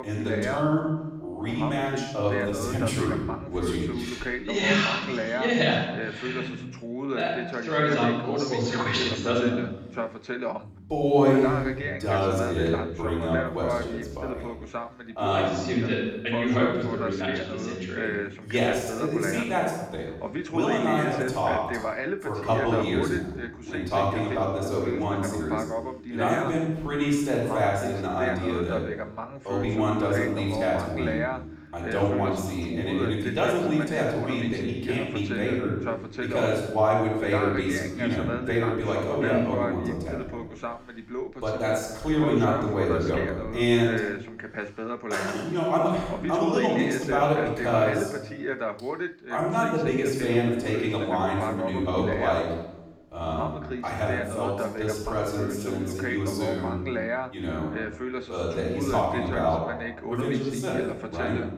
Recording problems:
off-mic speech; far
room echo; noticeable; dies away in 0.9 s
voice in the background; loud; throughout; 6 dB below the speech

